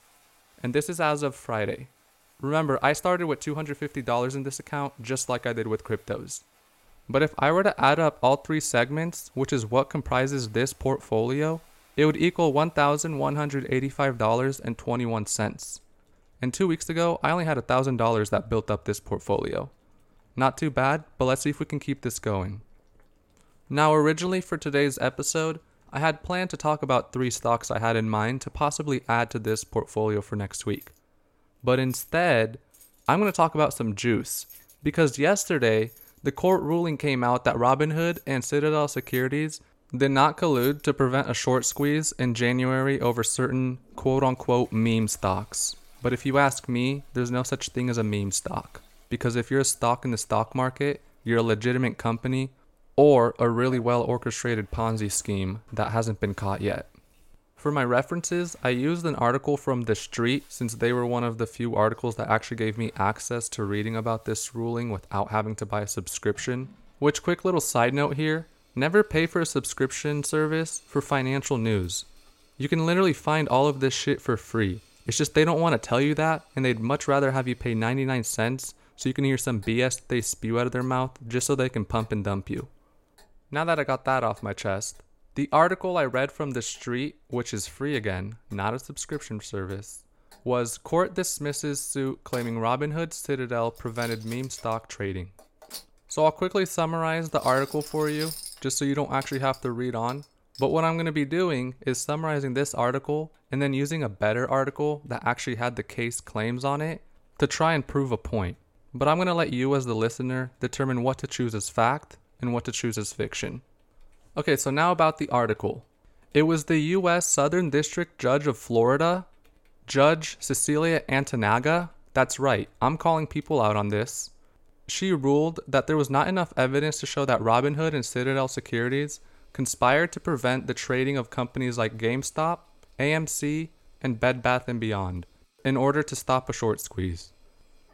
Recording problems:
household noises; faint; throughout; 25 dB below the speech

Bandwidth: 16.5 kHz